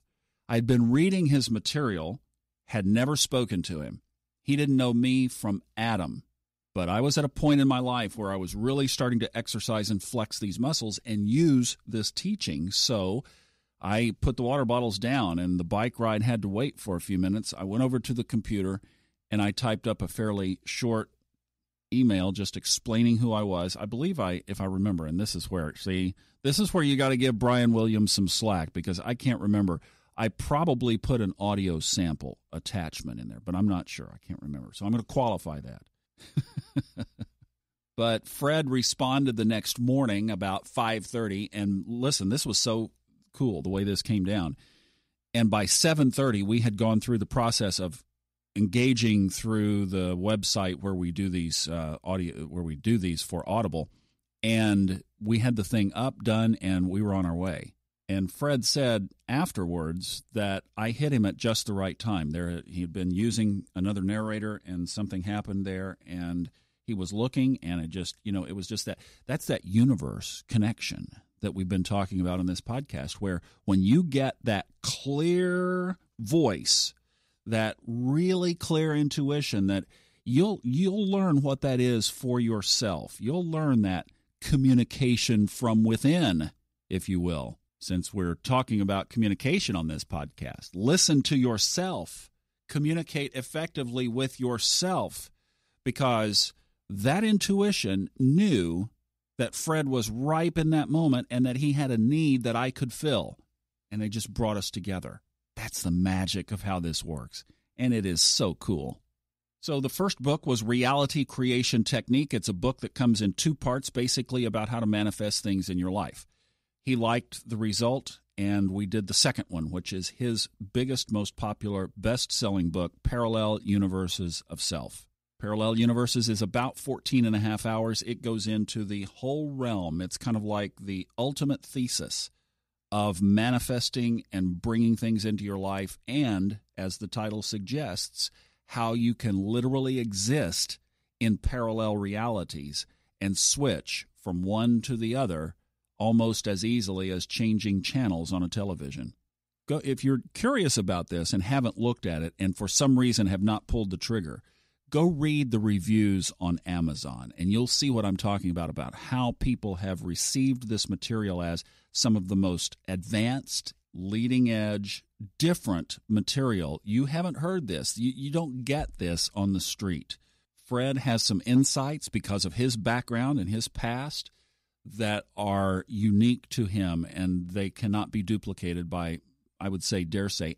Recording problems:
none

